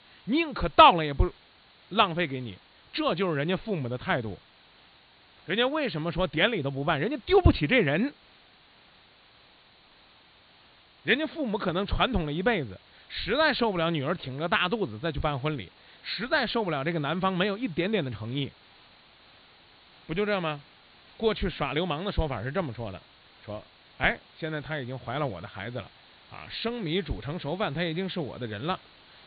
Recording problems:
high frequencies cut off; severe; nothing above 4.5 kHz
hiss; faint; throughout; 25 dB below the speech

